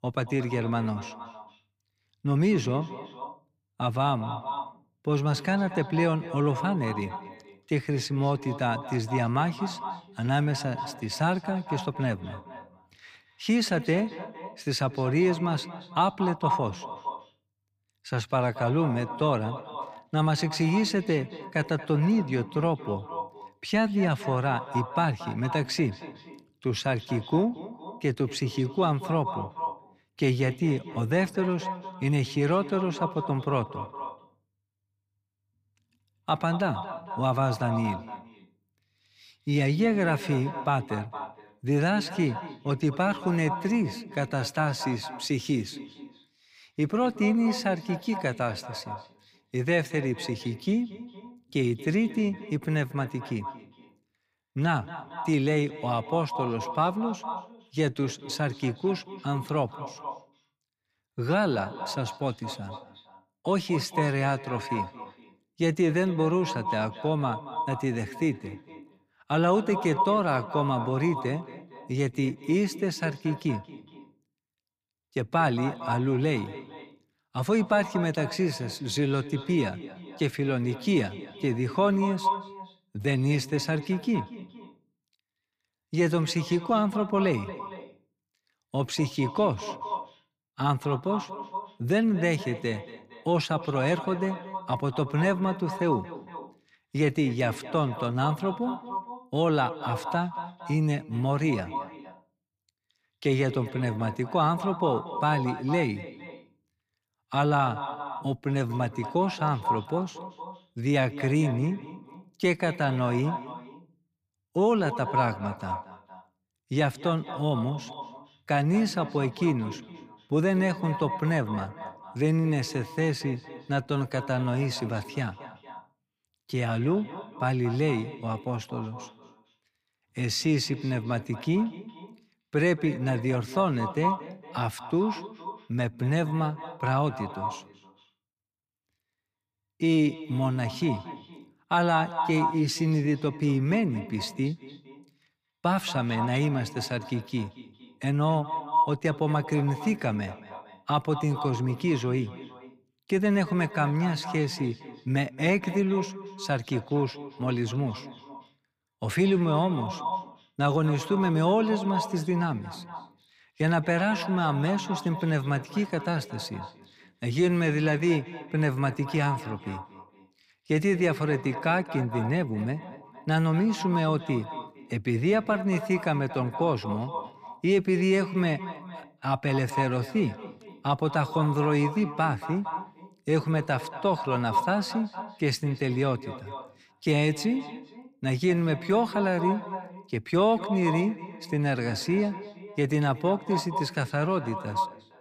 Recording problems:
echo of what is said; strong; throughout; 230 ms later, 10 dB below the speech

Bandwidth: 15 kHz